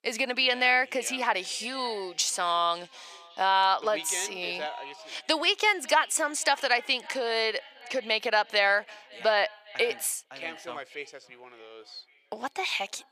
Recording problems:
thin; very; fading below 650 Hz
echo of what is said; faint; throughout; 550 ms later, 20 dB below the speech

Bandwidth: 14.5 kHz